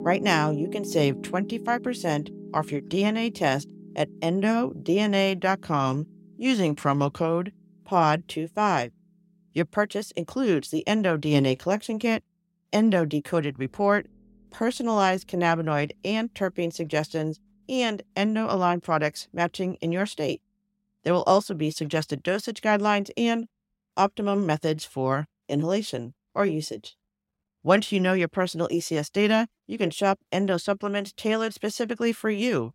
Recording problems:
background music; noticeable; throughout; 15 dB below the speech

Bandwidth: 16 kHz